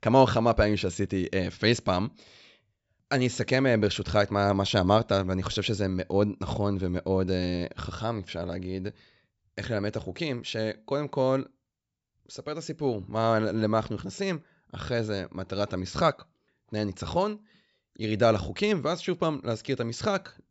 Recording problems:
high frequencies cut off; noticeable; nothing above 8 kHz

